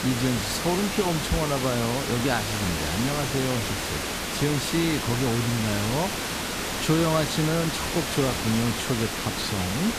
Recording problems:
hiss; loud; throughout; 1 dB below the speech

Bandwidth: 14.5 kHz